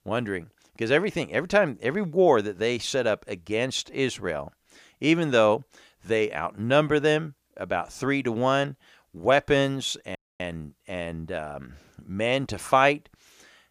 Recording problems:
audio cutting out; at 10 s

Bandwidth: 15 kHz